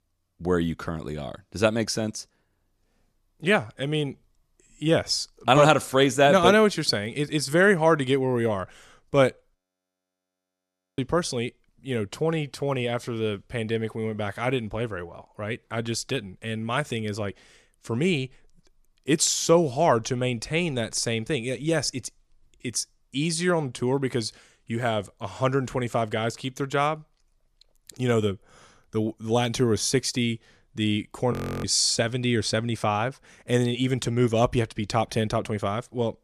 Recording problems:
audio freezing; at 9.5 s for 1.5 s and at 31 s

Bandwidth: 14.5 kHz